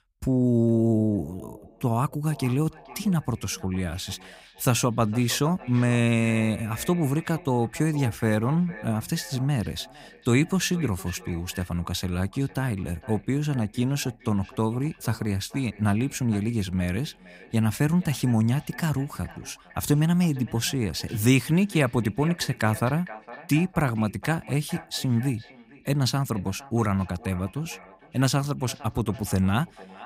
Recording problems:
echo of what is said; faint; throughout; 460 ms later, 20 dB below the speech

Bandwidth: 15.5 kHz